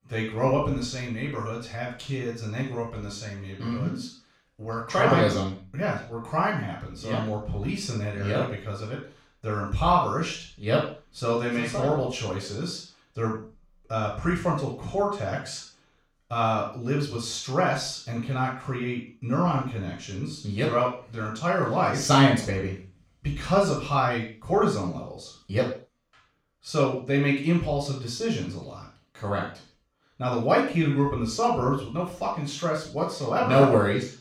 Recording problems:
off-mic speech; far
room echo; noticeable; dies away in 0.4 s

